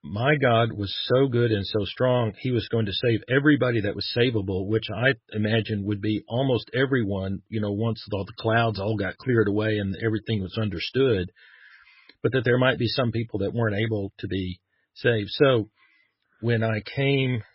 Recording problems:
garbled, watery; badly; nothing above 5.5 kHz

